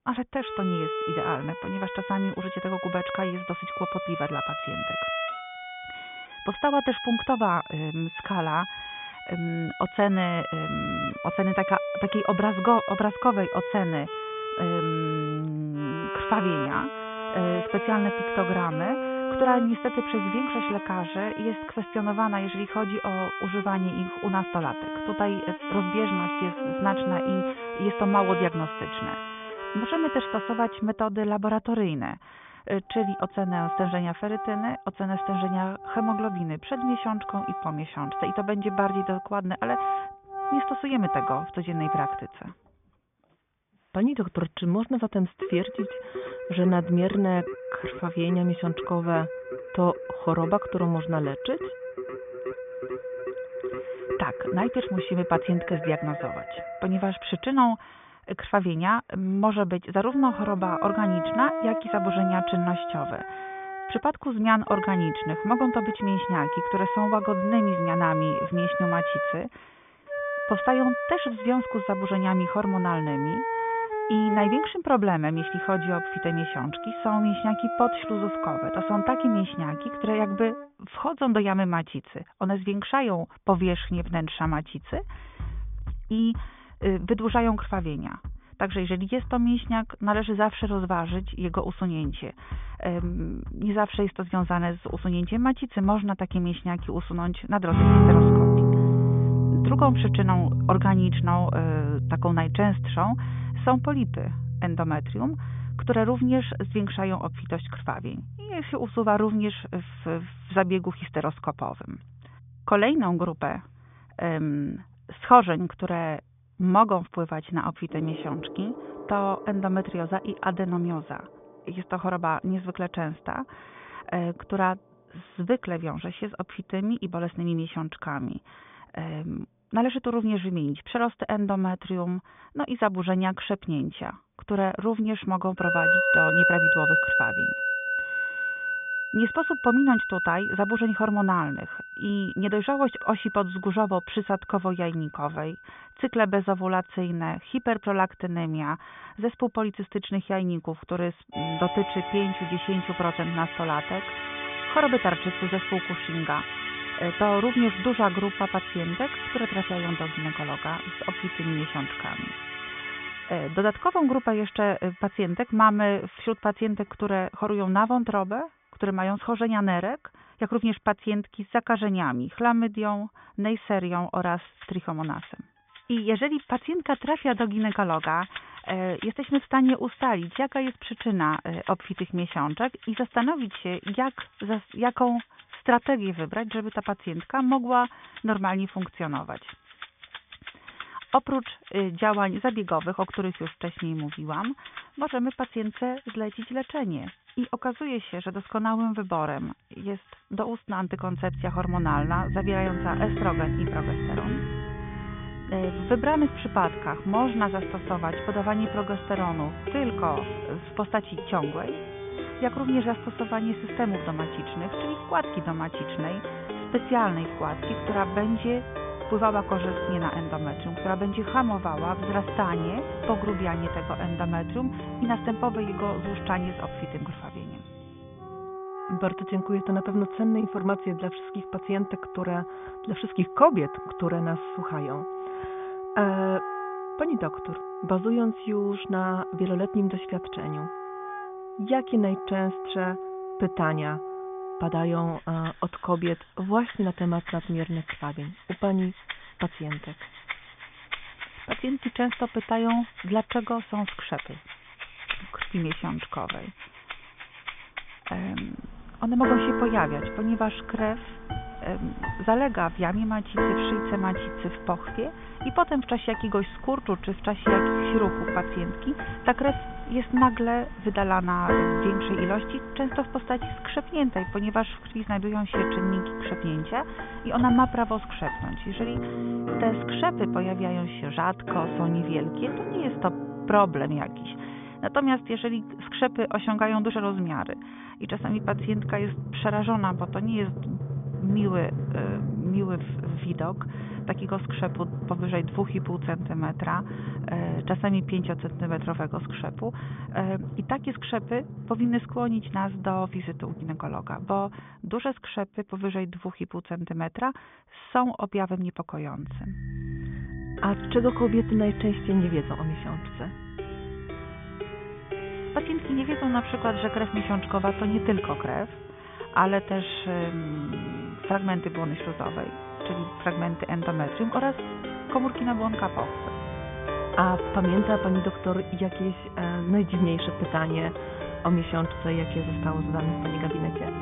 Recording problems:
high frequencies cut off; severe; nothing above 3.5 kHz
muffled; very slightly; fading above 4 kHz
background music; loud; throughout; 4 dB below the speech

